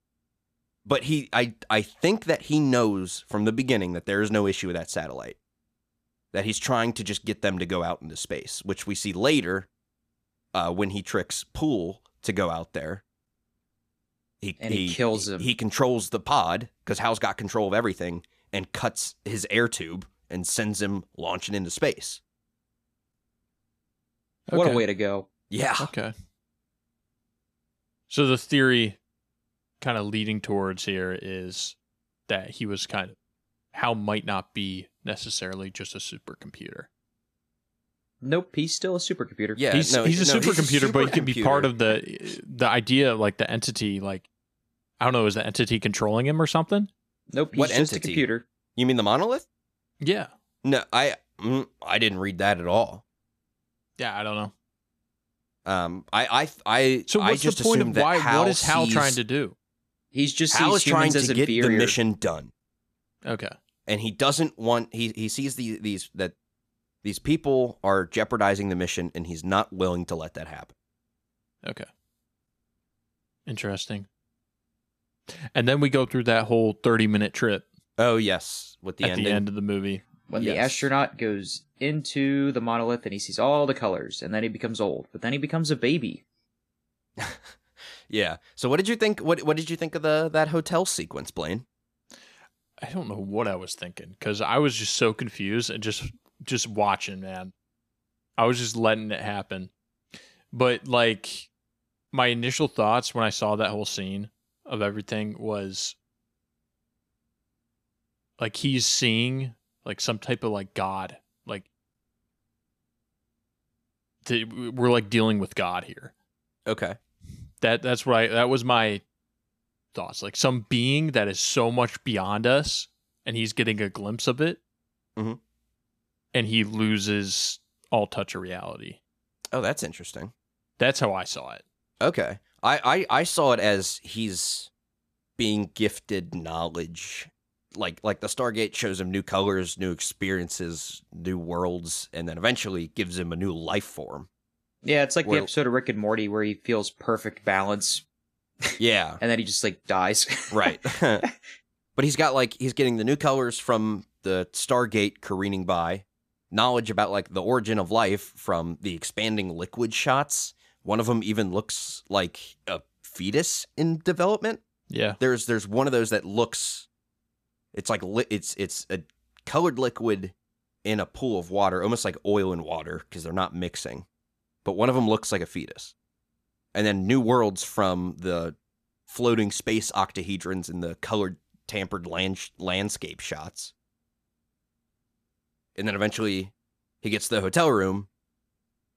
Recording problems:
none

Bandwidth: 14.5 kHz